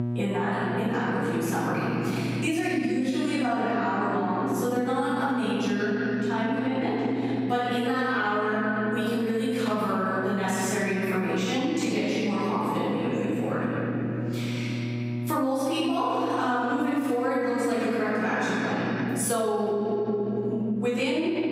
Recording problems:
room echo; strong; dies away in 3 s
off-mic speech; far
squashed, flat; somewhat
electrical hum; noticeable; throughout; 60 Hz, 20 dB below the speech

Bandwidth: 15.5 kHz